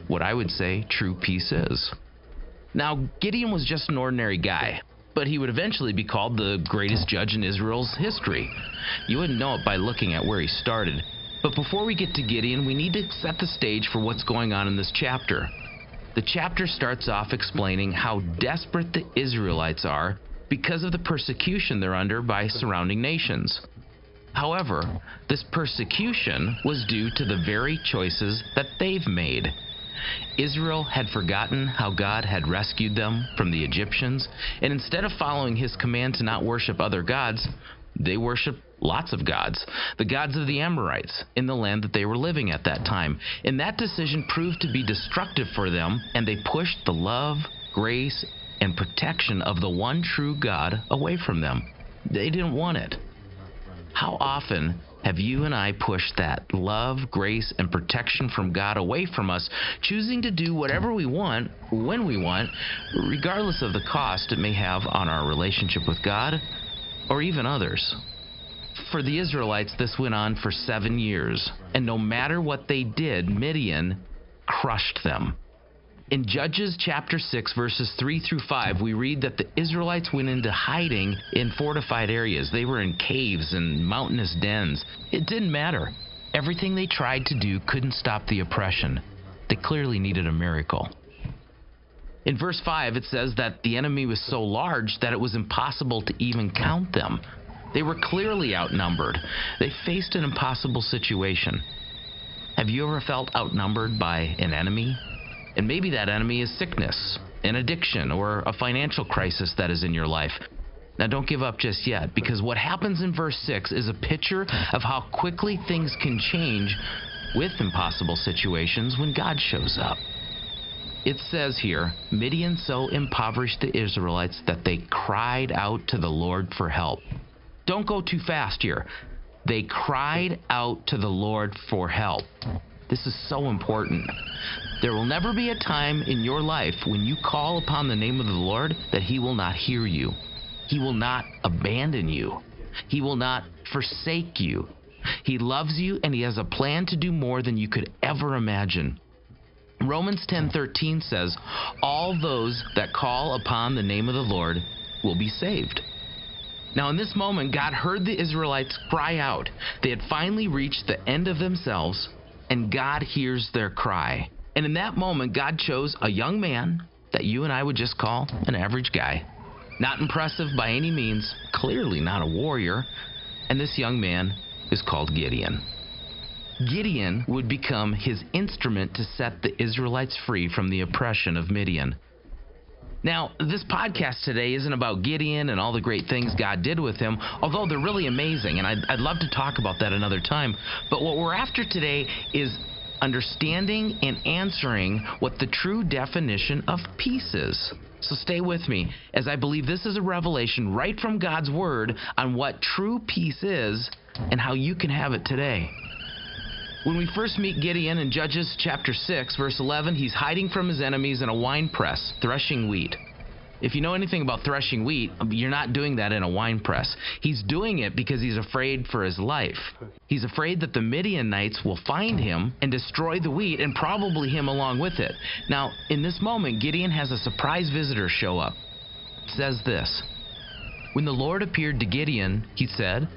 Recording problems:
high frequencies cut off; noticeable; nothing above 5.5 kHz
squashed, flat; somewhat
hiss; noticeable; throughout; 10 dB below the speech

